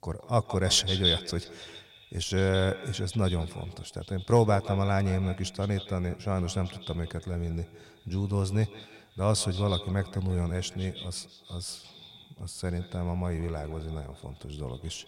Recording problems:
echo of what is said; strong; throughout; 170 ms later, 8 dB below the speech

